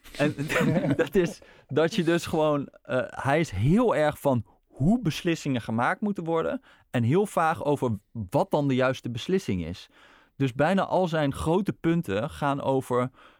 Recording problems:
none

